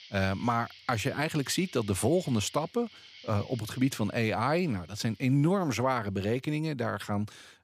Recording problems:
animal sounds; faint; throughout; 20 dB below the speech

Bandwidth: 15 kHz